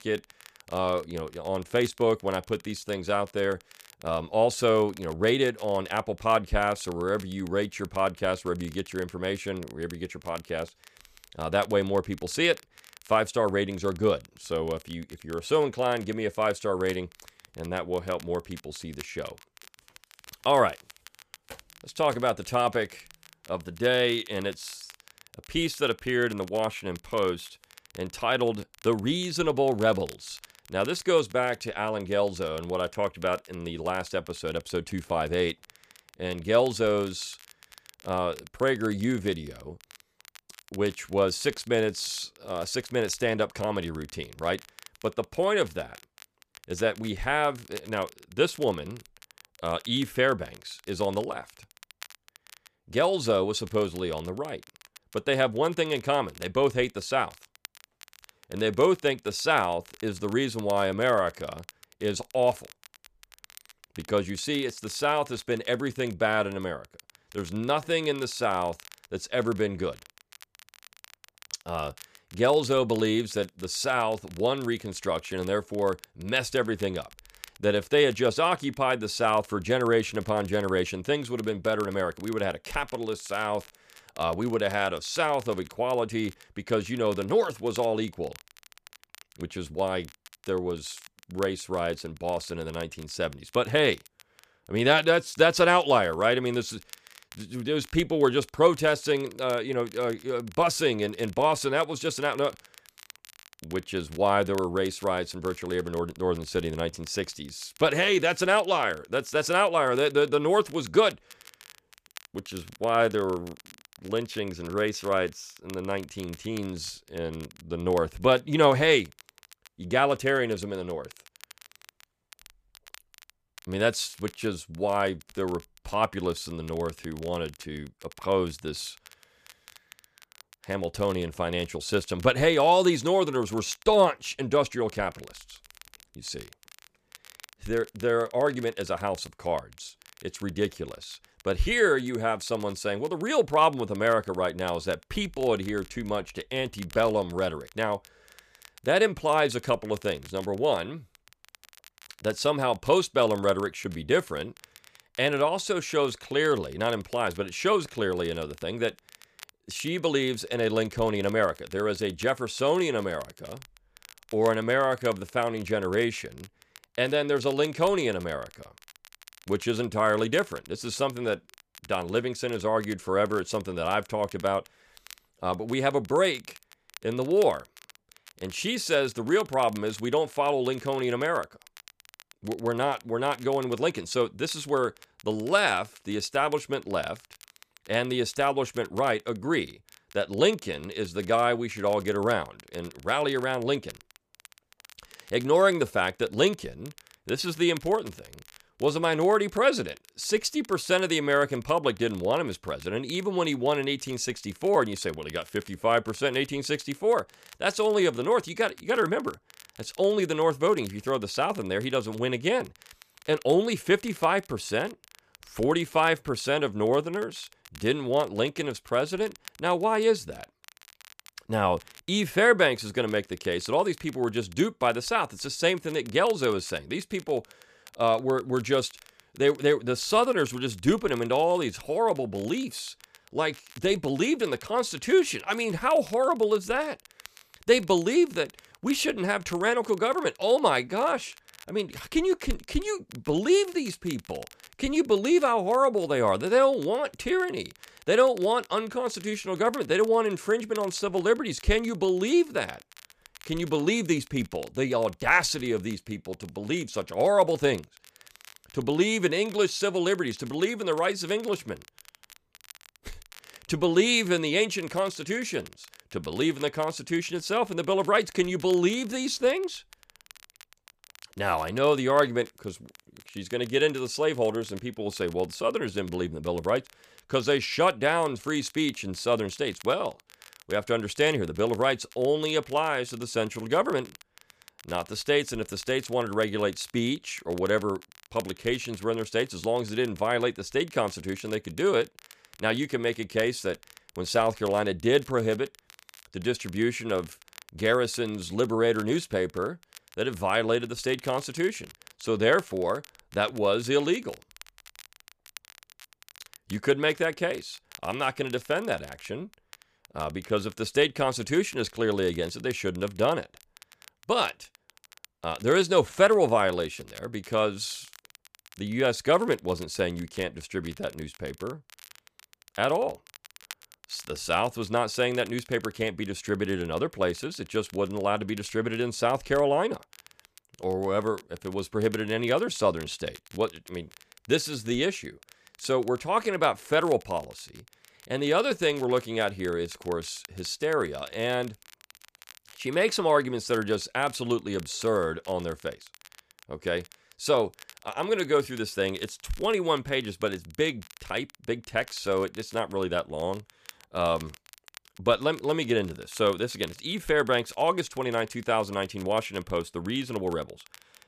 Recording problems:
crackle, like an old record; faint; 25 dB below the speech

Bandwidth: 14.5 kHz